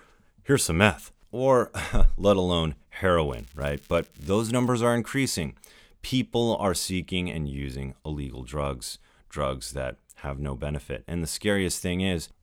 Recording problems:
crackling; faint; from 3.5 to 4.5 s; 25 dB below the speech

